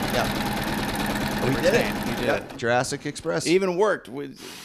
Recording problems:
machinery noise; loud; throughout; 2 dB below the speech

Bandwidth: 14.5 kHz